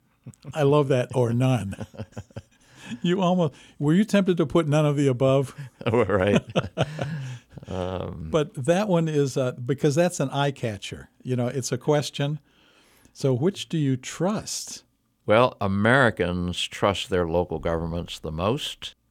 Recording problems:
none

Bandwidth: 17.5 kHz